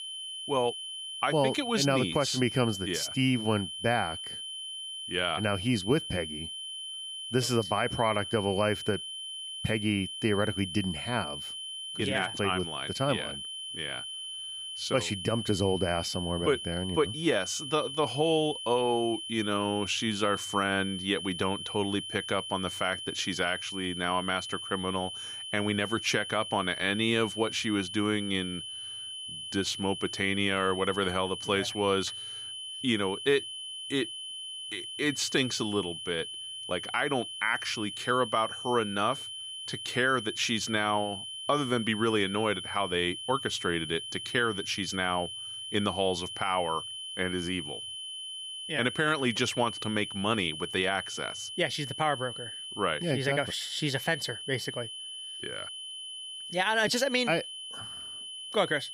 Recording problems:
high-pitched whine; loud; throughout; 3 kHz, 7 dB below the speech

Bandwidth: 15.5 kHz